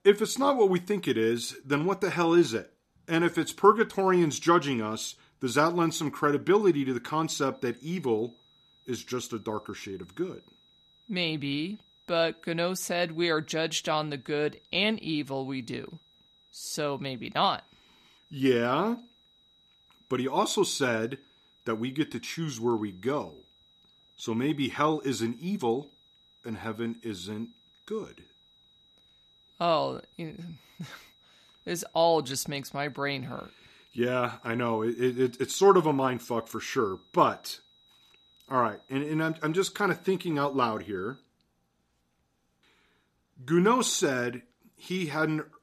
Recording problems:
high-pitched whine; faint; from 7.5 to 41 s; 4 kHz, 30 dB below the speech

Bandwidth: 14 kHz